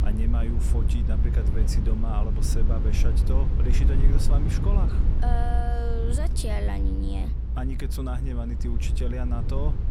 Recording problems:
low rumble; loud; throughout; 5 dB below the speech

